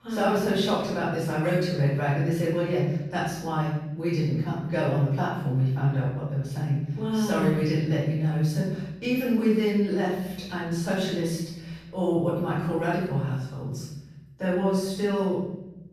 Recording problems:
room echo; strong; dies away in 0.9 s
off-mic speech; far

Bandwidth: 14 kHz